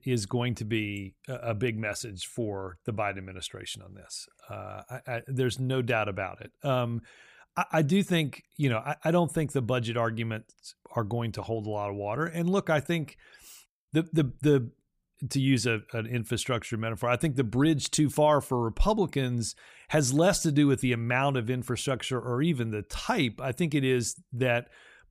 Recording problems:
none

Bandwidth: 15 kHz